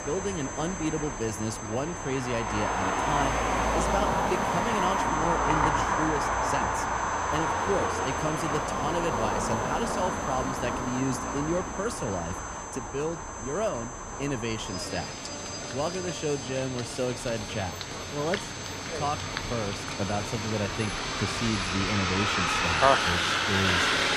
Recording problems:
echo of what is said; faint; throughout; 580 ms later, 20 dB below the speech
traffic noise; very loud; throughout; 3 dB above the speech
high-pitched whine; loud; throughout; 6.5 kHz, 9 dB below the speech
chatter from many people; faint; throughout; 20 dB below the speech

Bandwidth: 15 kHz